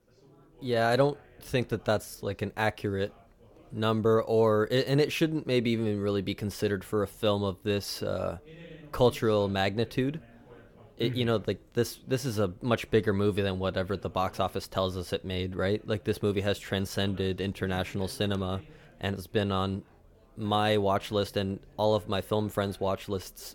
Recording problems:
background chatter; faint; throughout; 4 voices, 25 dB below the speech

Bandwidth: 17.5 kHz